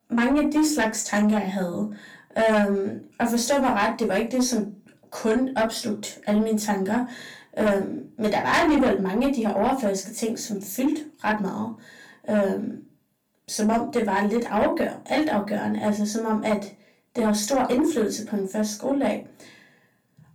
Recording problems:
off-mic speech; far
distortion; slight; 10 dB below the speech
room echo; very slight; dies away in 0.3 s

